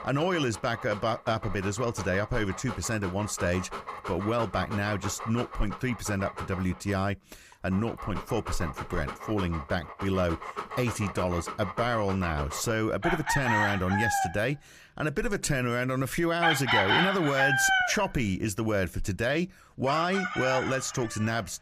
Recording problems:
animal sounds; loud; throughout; 3 dB below the speech

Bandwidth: 15 kHz